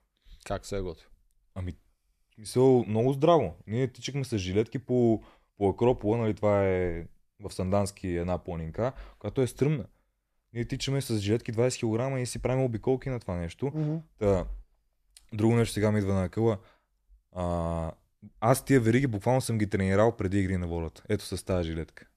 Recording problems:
none

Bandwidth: 14.5 kHz